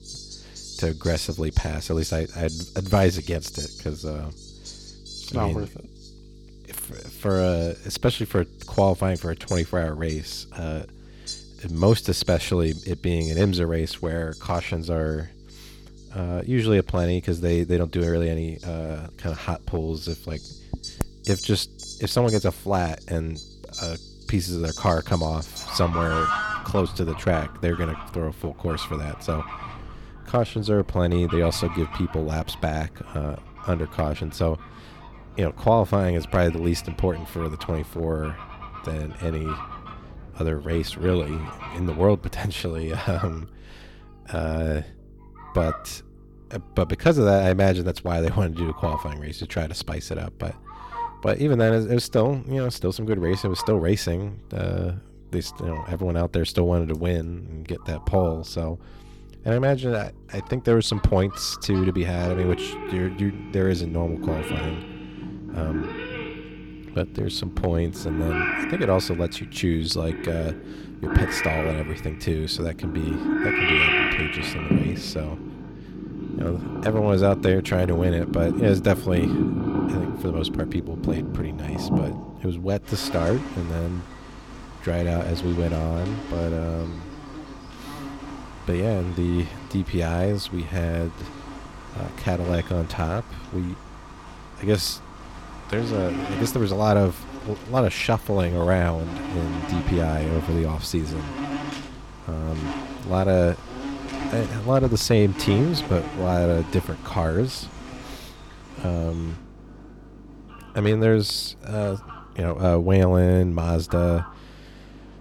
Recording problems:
animal sounds; loud; throughout; 7 dB below the speech
electrical hum; faint; throughout; 50 Hz, 30 dB below the speech

